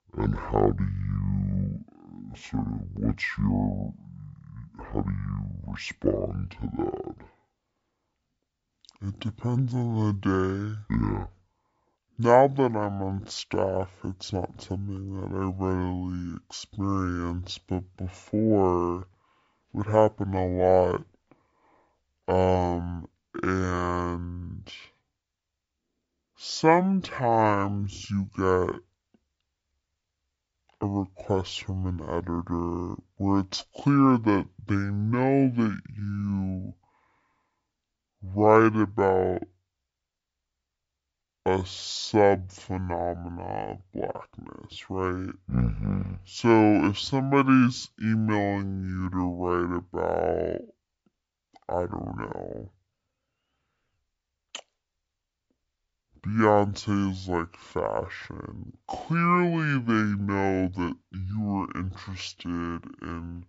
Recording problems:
wrong speed and pitch; too slow and too low; 0.6 times normal speed

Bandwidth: 7.5 kHz